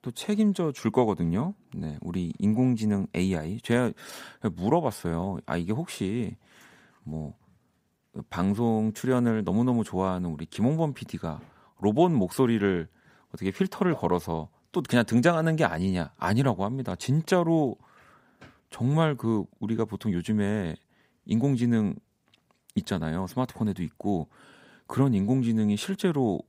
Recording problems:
none

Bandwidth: 15.5 kHz